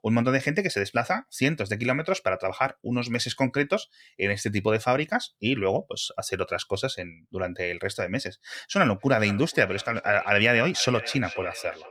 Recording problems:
echo of what is said; noticeable; from 9 s on; 480 ms later, 15 dB below the speech

